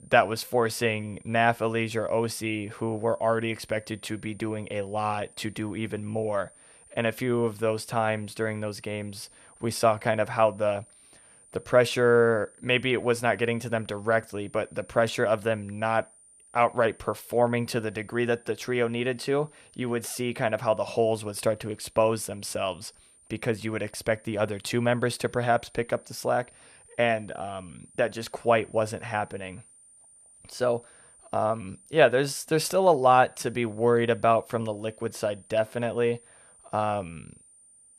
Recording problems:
high-pitched whine; faint; throughout; 9 kHz, 25 dB below the speech

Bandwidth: 14.5 kHz